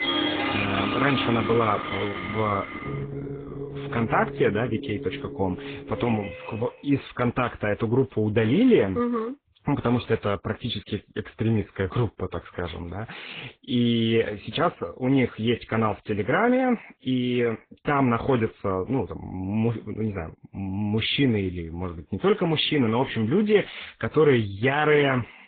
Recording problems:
garbled, watery; badly; nothing above 3.5 kHz
high frequencies cut off; slight
background music; loud; until 6 s; 6 dB below the speech

